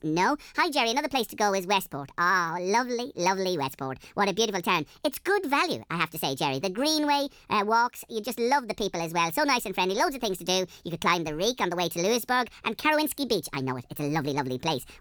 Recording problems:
wrong speed and pitch; too fast and too high; 1.5 times normal speed

